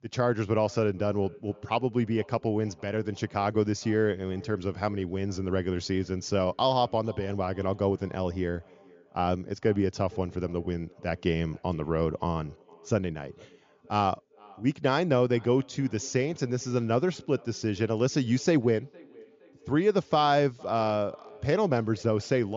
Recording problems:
high frequencies cut off; noticeable; nothing above 7 kHz
echo of what is said; faint; throughout; 460 ms later, 25 dB below the speech
abrupt cut into speech; at the end

